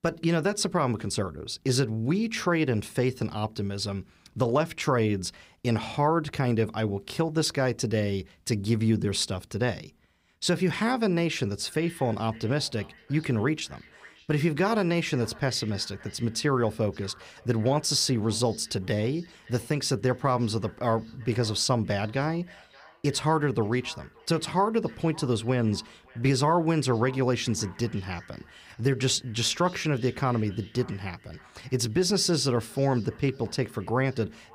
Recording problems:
echo of what is said; faint; from 12 s on; 570 ms later, 25 dB below the speech

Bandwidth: 15.5 kHz